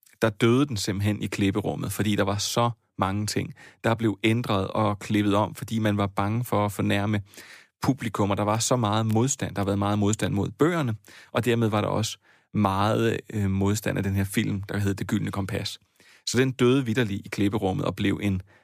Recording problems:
none

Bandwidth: 15 kHz